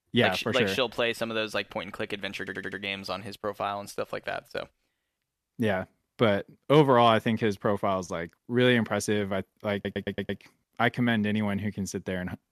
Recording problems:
audio stuttering; at 2.5 s and at 9.5 s

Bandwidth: 14 kHz